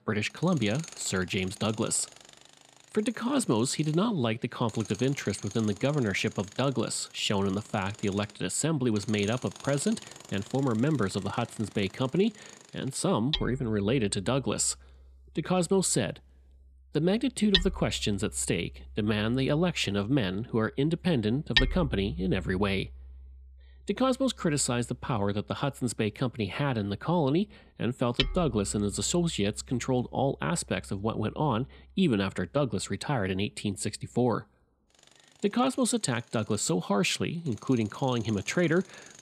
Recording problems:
machinery noise; loud; throughout; 9 dB below the speech

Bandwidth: 14.5 kHz